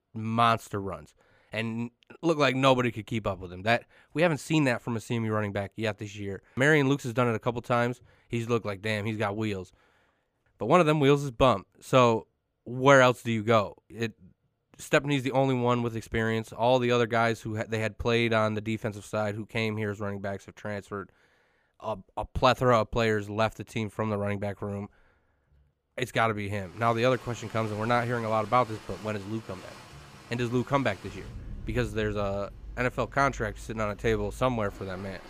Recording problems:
rain or running water; noticeable; from 27 s on; 20 dB below the speech

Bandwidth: 15 kHz